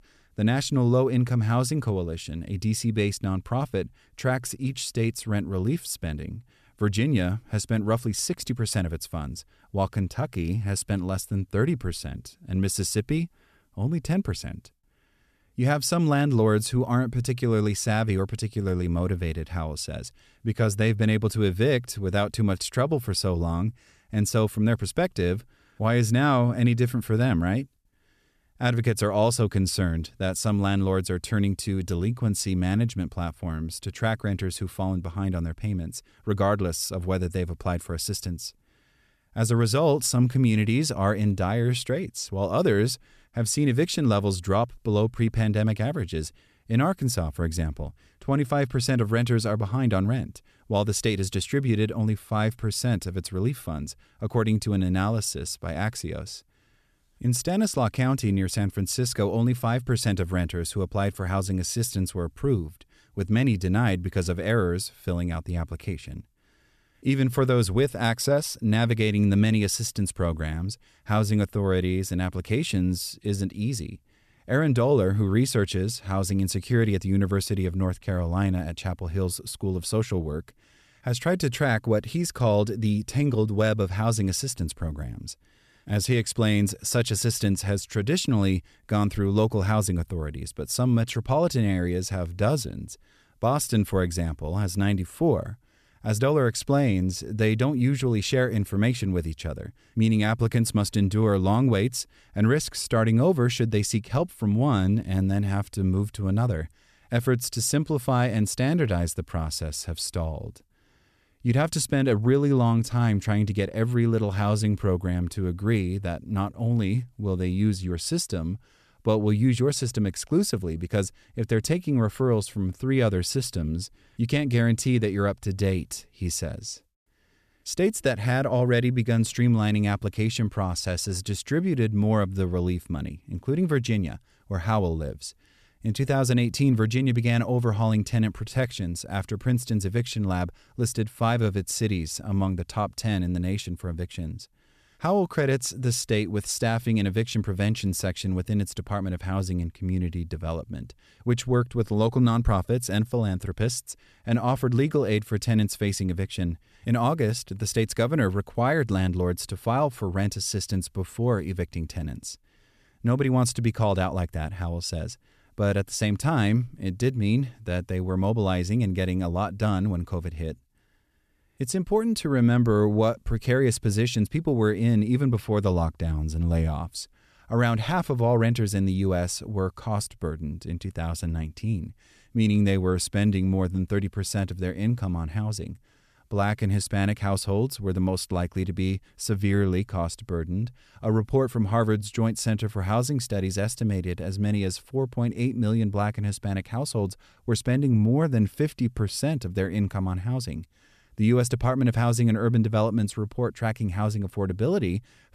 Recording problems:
none

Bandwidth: 14 kHz